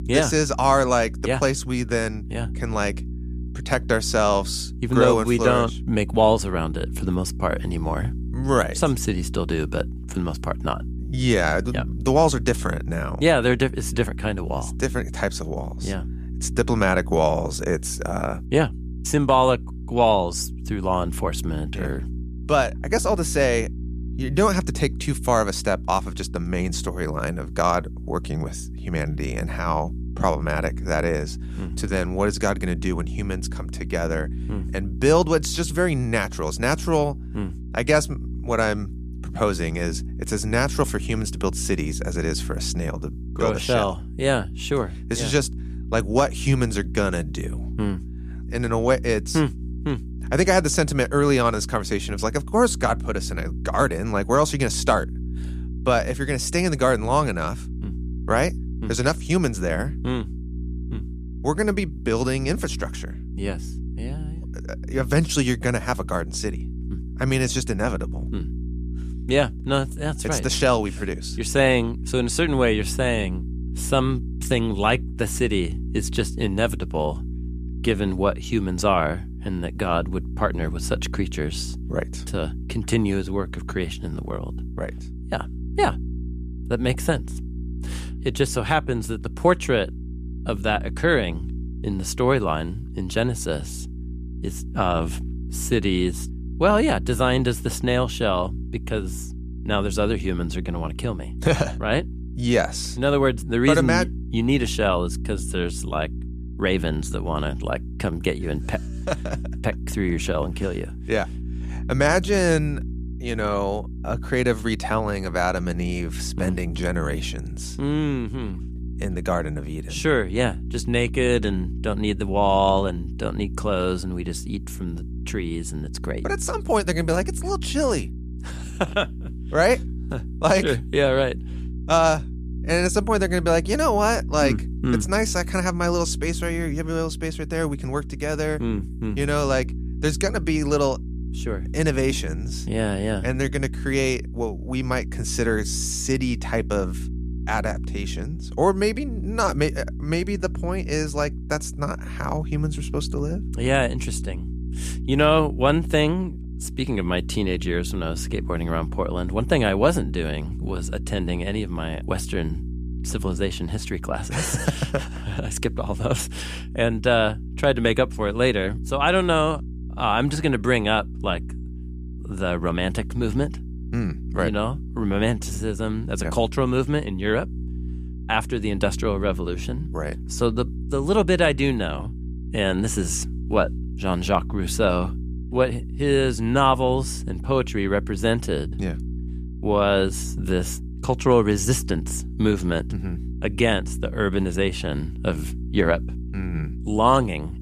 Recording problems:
electrical hum; noticeable; throughout; 60 Hz, 20 dB below the speech

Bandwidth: 14.5 kHz